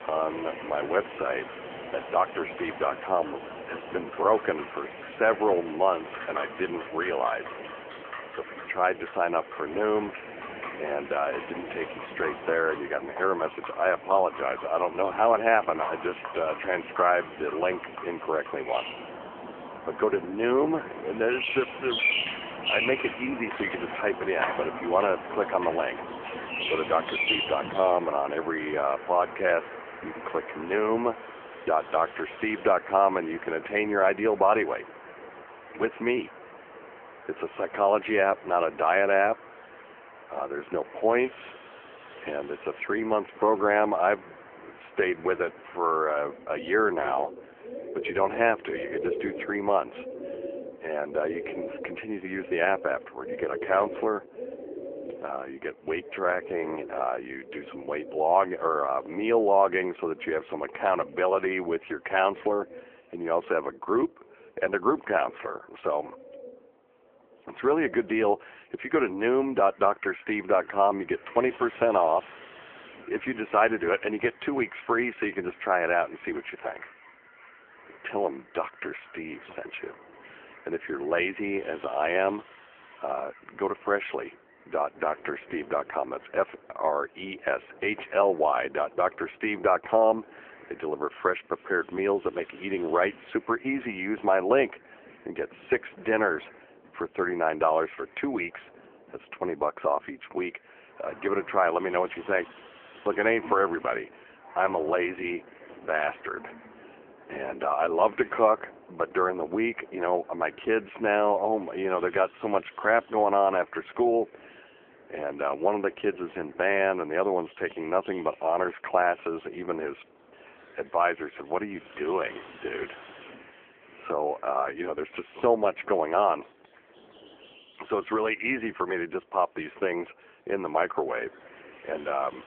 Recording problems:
phone-call audio; poor line
animal sounds; loud; throughout; 10 dB below the speech
wind noise on the microphone; occasional gusts; until 51 s and from 1:11 on; 25 dB below the speech

